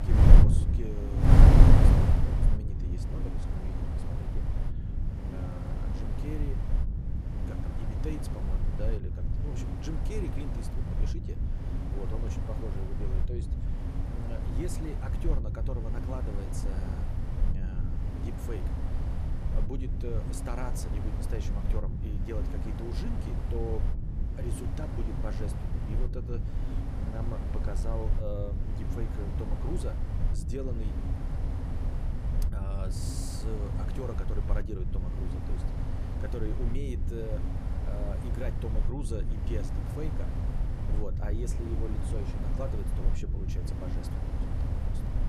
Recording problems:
wind noise on the microphone; heavy; 2 dB above the speech

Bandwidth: 14.5 kHz